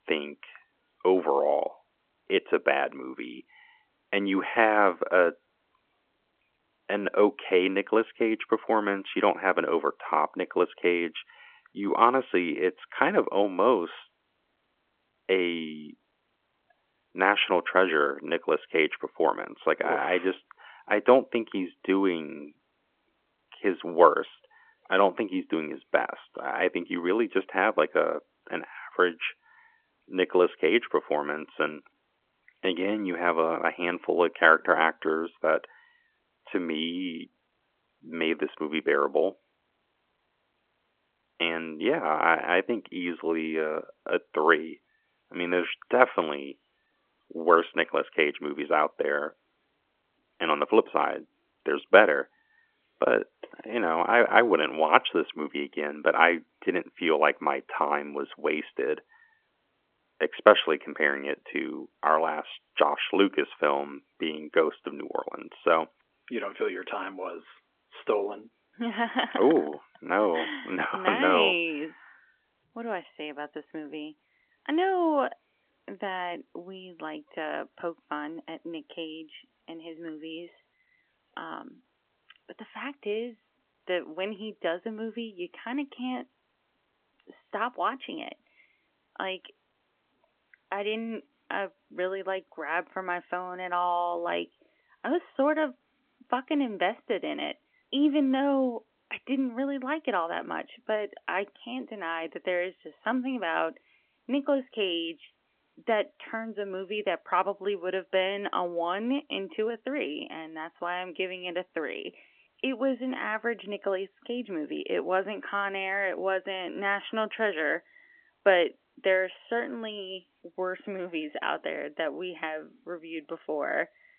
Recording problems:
phone-call audio; nothing above 3.5 kHz

